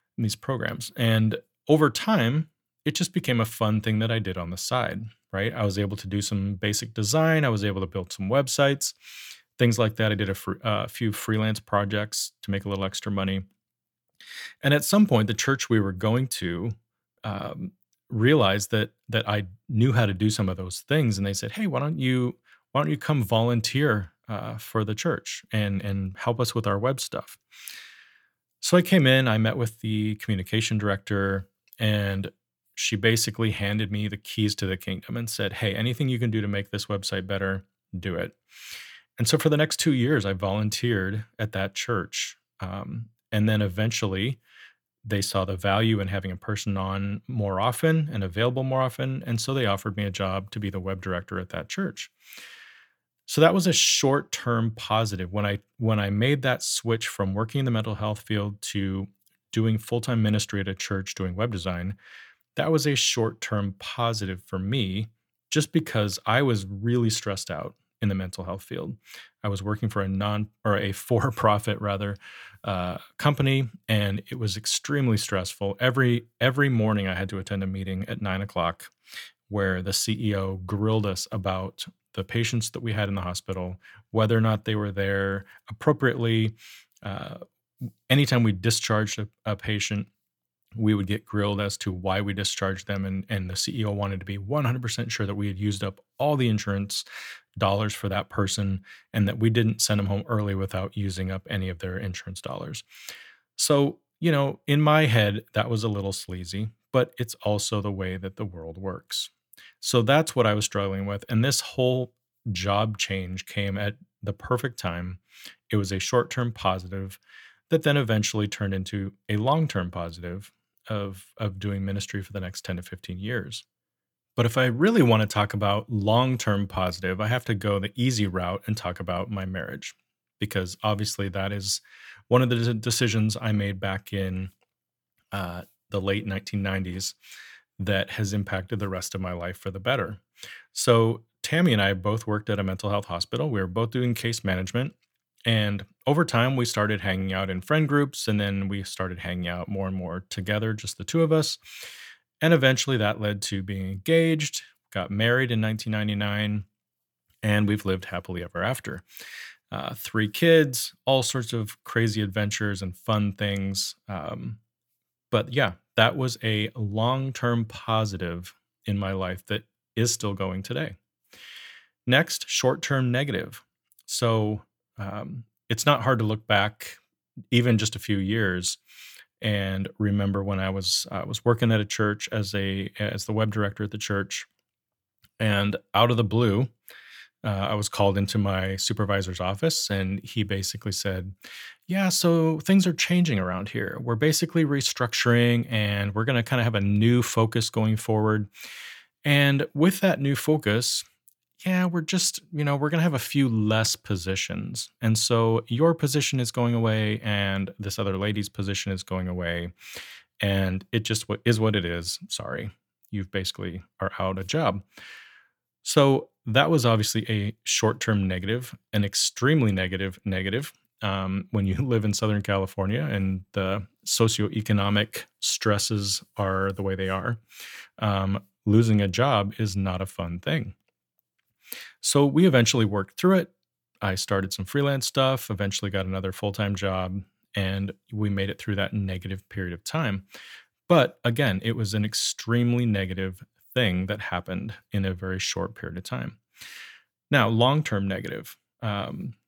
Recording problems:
none

